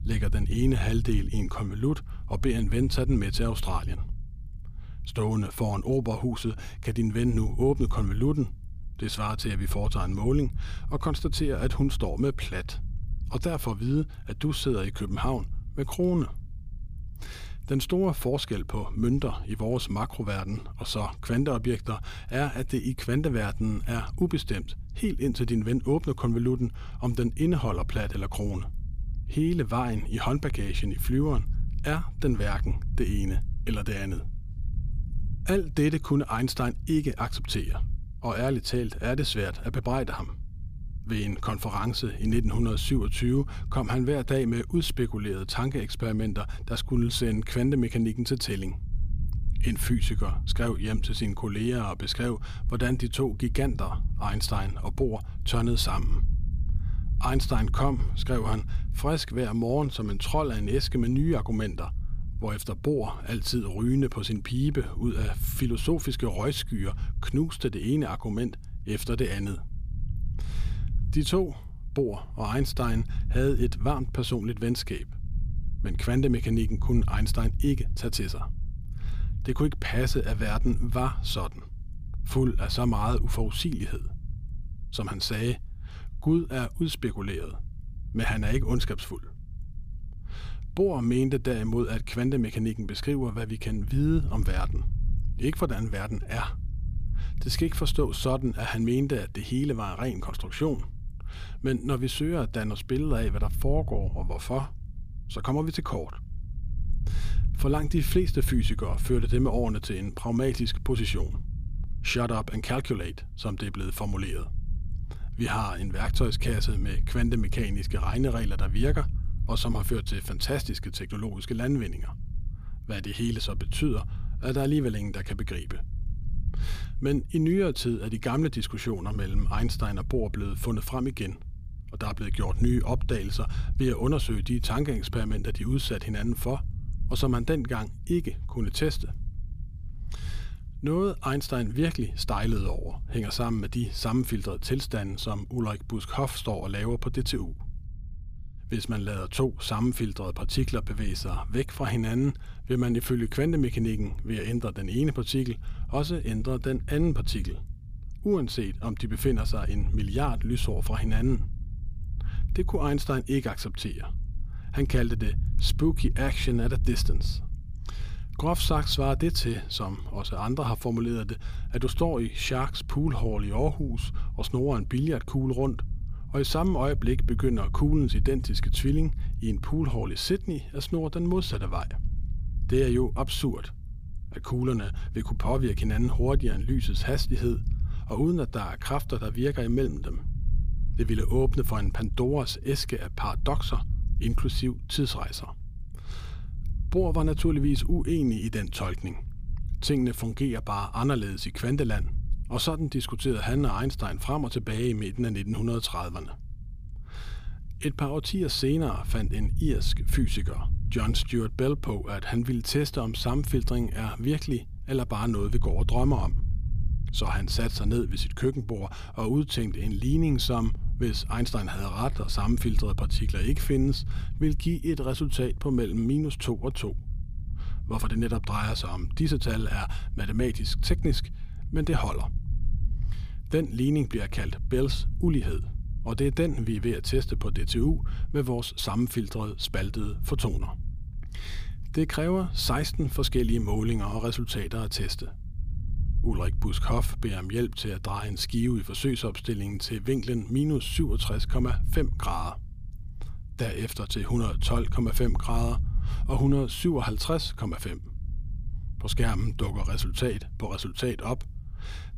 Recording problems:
low rumble; noticeable; throughout; 20 dB below the speech

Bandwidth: 15 kHz